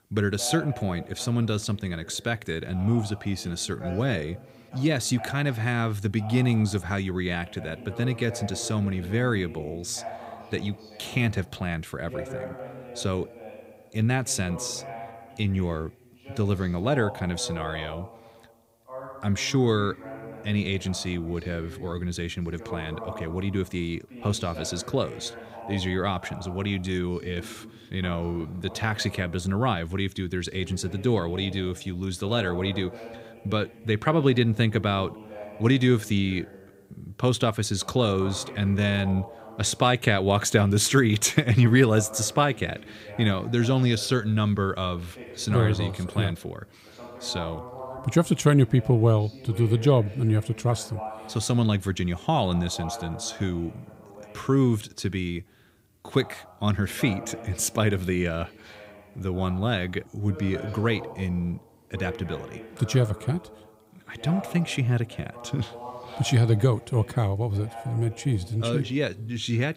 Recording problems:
voice in the background; noticeable; throughout; 15 dB below the speech

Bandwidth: 15.5 kHz